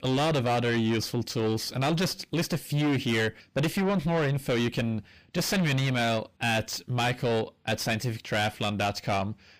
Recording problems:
distortion; heavy; 5 dB below the speech

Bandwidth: 15 kHz